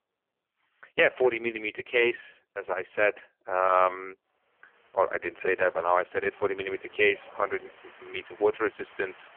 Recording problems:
phone-call audio; poor line
wind in the background; faint; throughout; 25 dB below the speech

